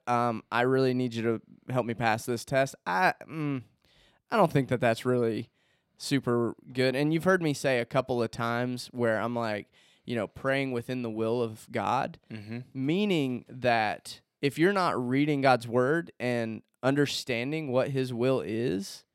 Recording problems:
none

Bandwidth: 16 kHz